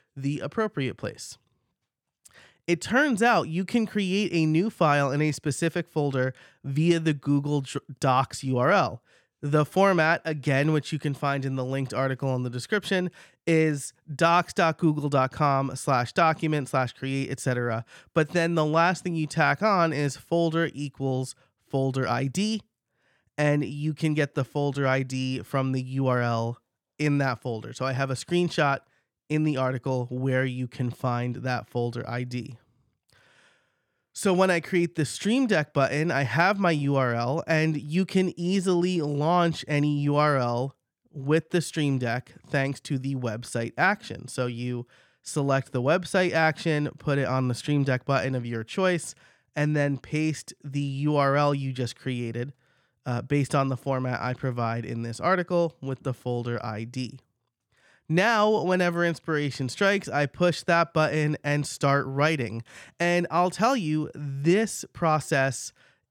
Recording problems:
none

